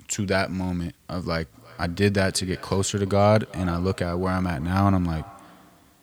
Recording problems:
echo of what is said; faint; from 1.5 s on; 350 ms later, 20 dB below the speech

